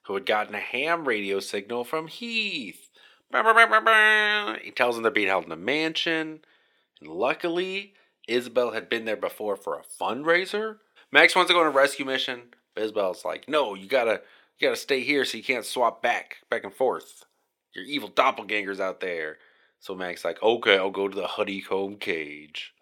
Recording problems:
thin; somewhat; fading below 400 Hz

